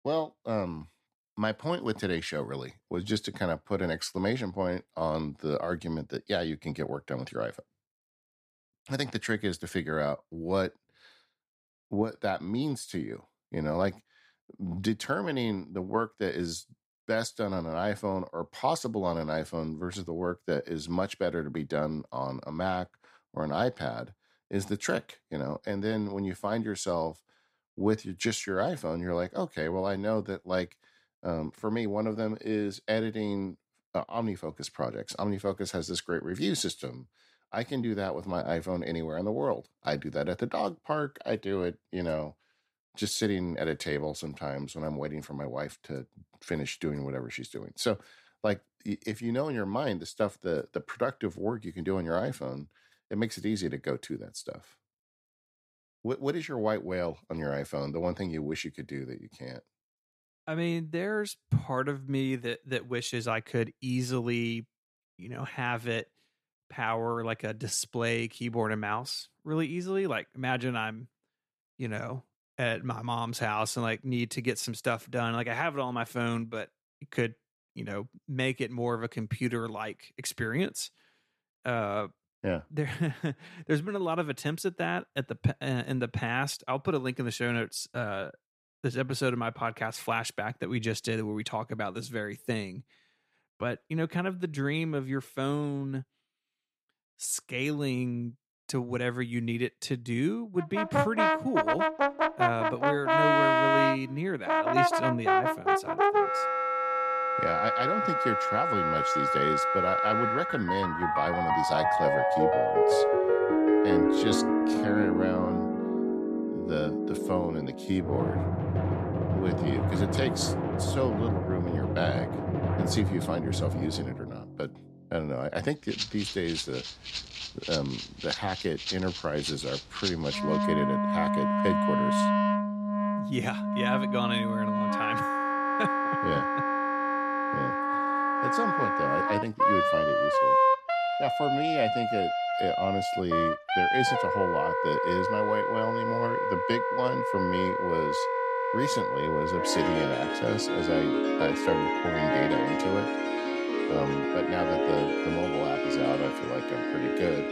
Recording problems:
background music; very loud; from 1:41 on; 5 dB above the speech

